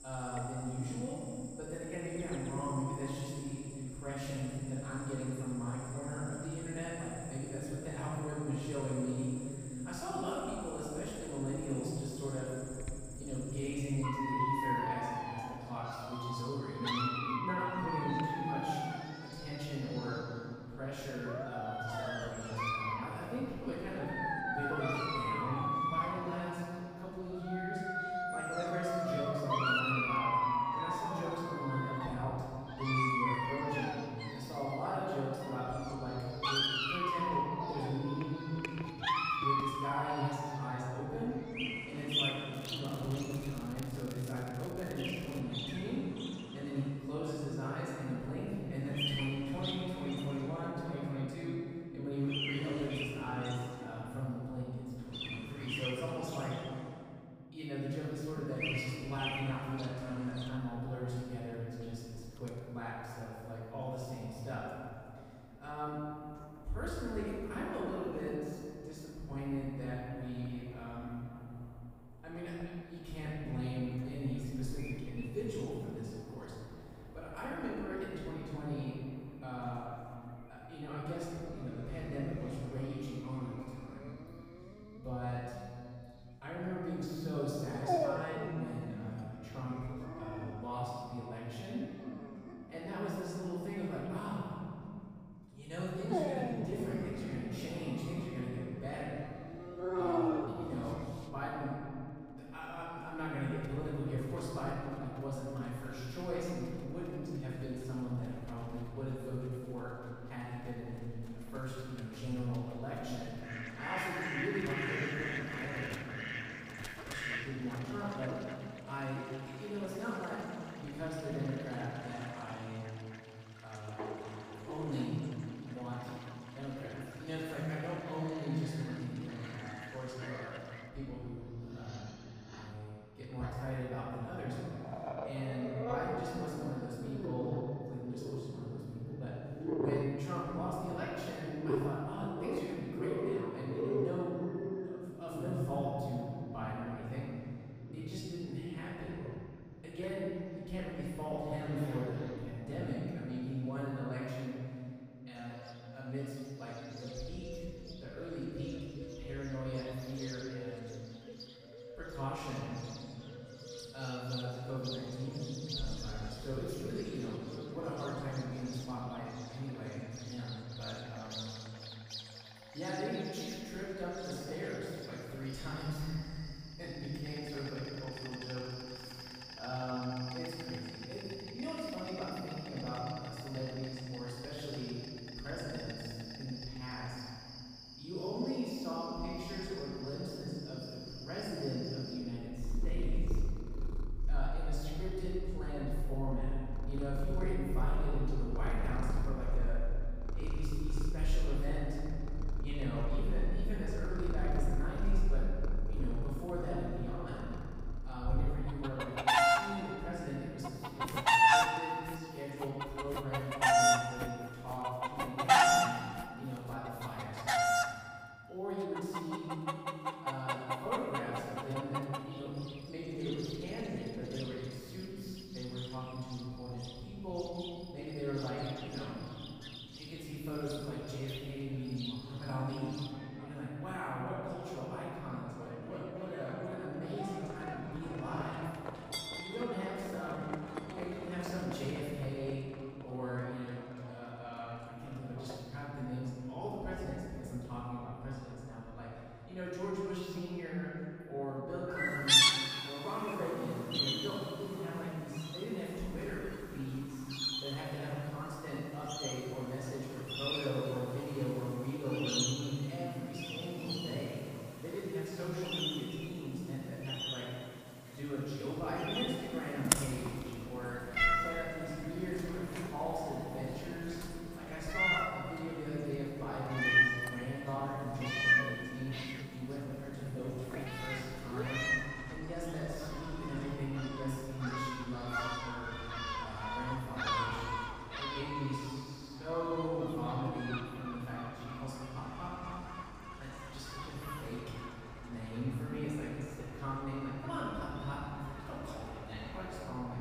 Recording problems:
room echo; strong; dies away in 2.6 s
off-mic speech; far
animal sounds; very loud; throughout; 3 dB above the speech
crackling; noticeable; from 43 to 45 s; 15 dB below the speech
footsteps; noticeable; from 3:31 to 3:37; peak 5 dB below the speech

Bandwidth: 15.5 kHz